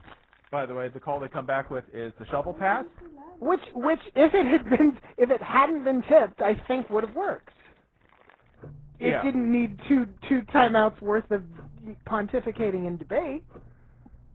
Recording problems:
garbled, watery; badly
muffled; very; fading above 1.5 kHz
household noises; faint; throughout; 25 dB below the speech

